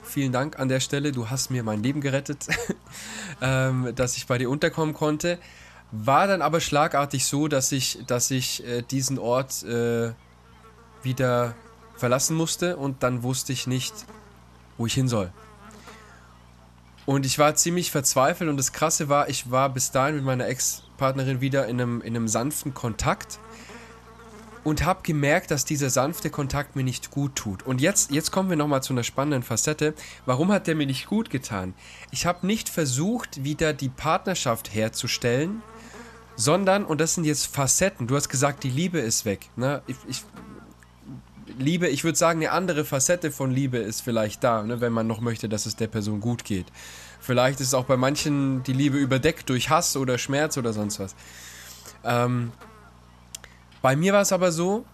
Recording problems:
electrical hum; faint; throughout; 60 Hz, 25 dB below the speech

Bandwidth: 13.5 kHz